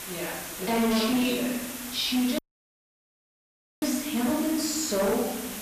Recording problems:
off-mic speech; far
room echo; noticeable; dies away in 1 s
distortion; slight; 10 dB below the speech
hiss; loud; throughout; 8 dB below the speech
audio cutting out; at 2.5 s for 1.5 s

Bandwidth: 14.5 kHz